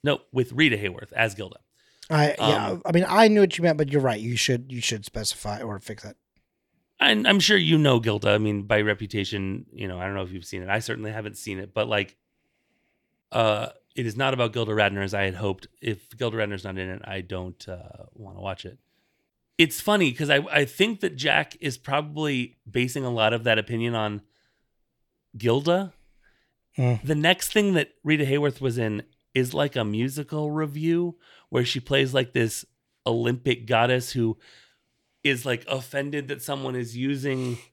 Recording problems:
none

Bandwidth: 18 kHz